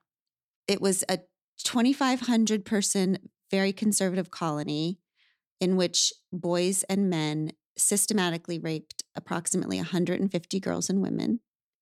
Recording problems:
none

